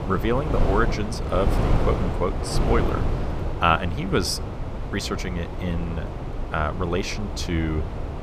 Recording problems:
wind noise on the microphone; heavy; 6 dB below the speech

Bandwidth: 14.5 kHz